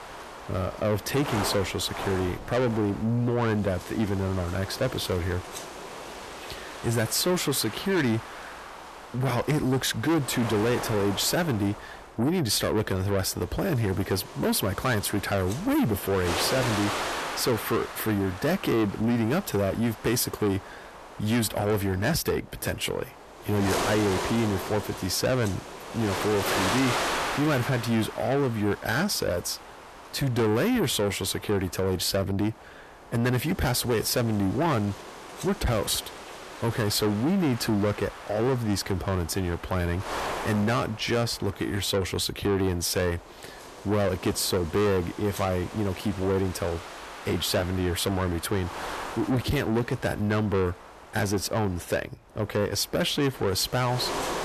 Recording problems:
distortion; heavy; 7 dB below the speech
wind noise on the microphone; heavy; 6 dB below the speech

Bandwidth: 13.5 kHz